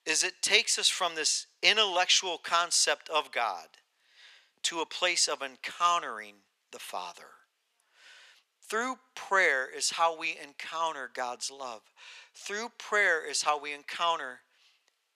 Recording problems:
thin; very; fading below 650 Hz

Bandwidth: 14.5 kHz